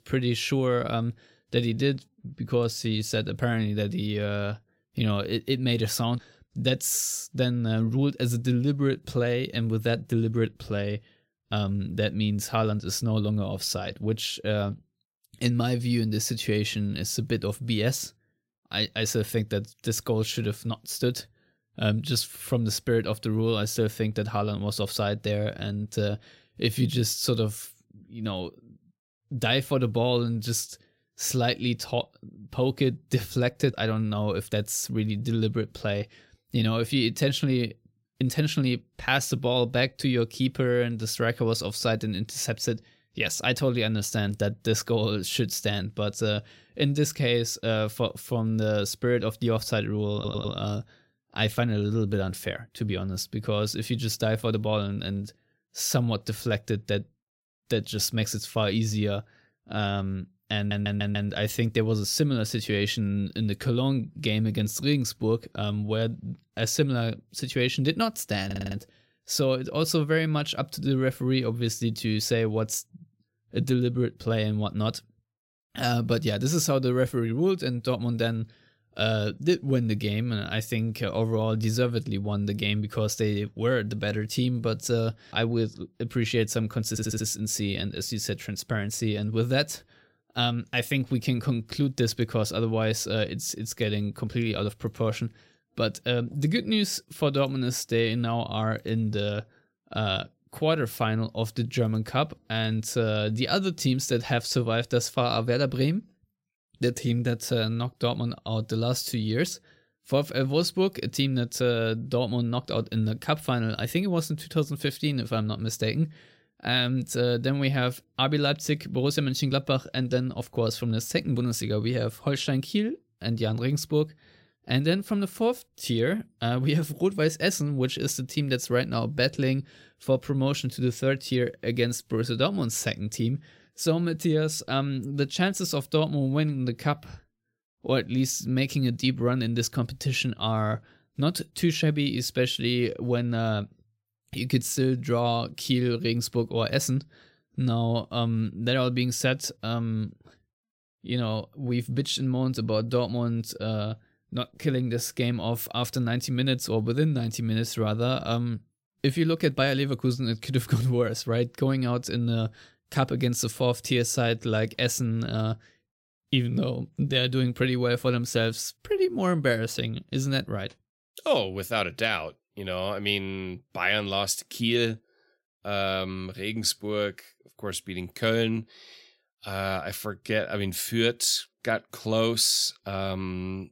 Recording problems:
audio stuttering; 4 times, first at 50 s

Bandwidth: 16 kHz